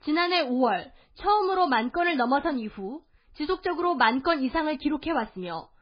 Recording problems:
garbled, watery; badly; nothing above 4.5 kHz

